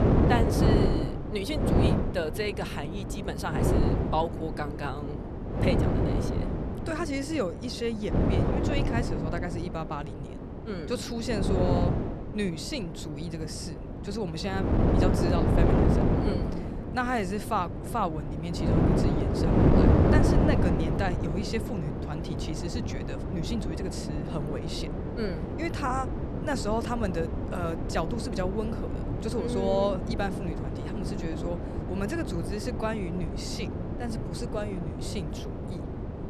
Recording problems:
wind noise on the microphone; heavy; as loud as the speech

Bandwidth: 13.5 kHz